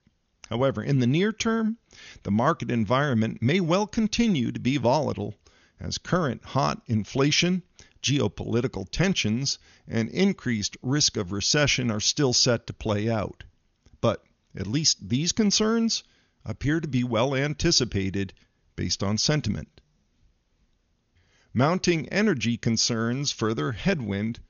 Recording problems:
high frequencies cut off; noticeable; nothing above 6.5 kHz

